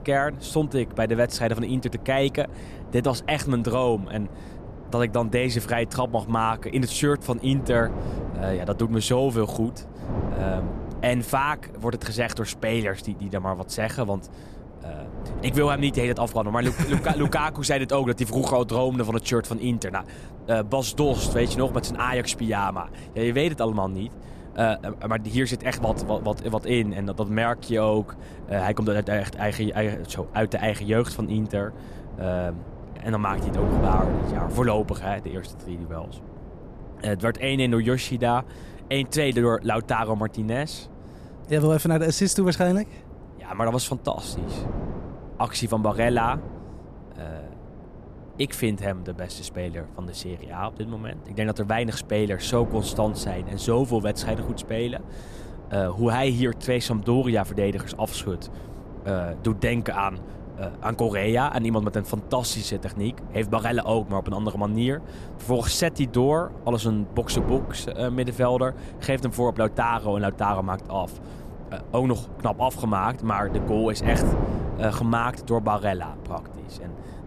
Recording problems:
wind noise on the microphone; occasional gusts; 15 dB below the speech

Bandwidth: 14.5 kHz